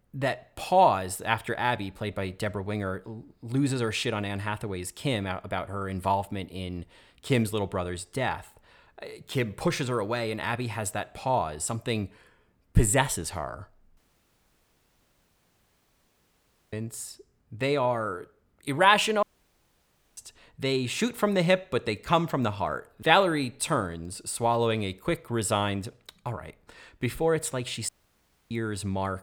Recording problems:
audio cutting out; at 14 s for 2.5 s, at 19 s for 1 s and at 28 s for 0.5 s

